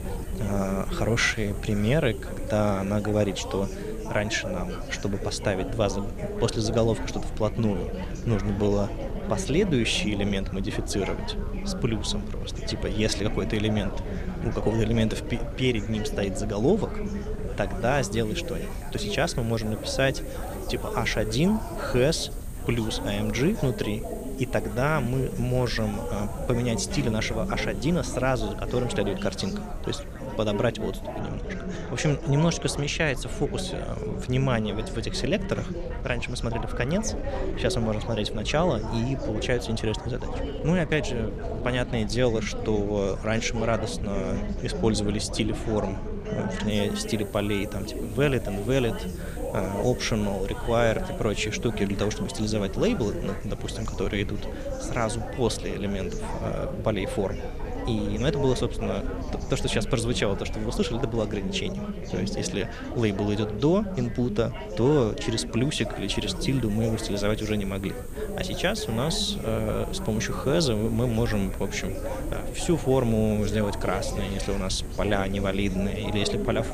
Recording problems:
chatter from many people; loud; throughout; 8 dB below the speech
wind noise on the microphone; occasional gusts; 20 dB below the speech
hiss; faint; until 31 s and from 47 s on; 25 dB below the speech

